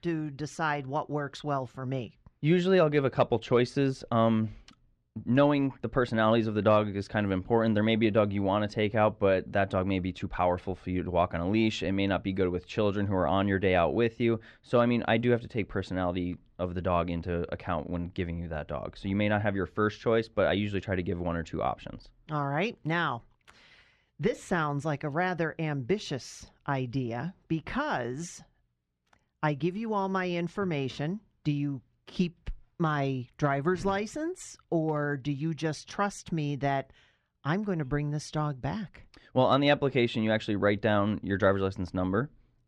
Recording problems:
muffled; slightly; fading above 3.5 kHz

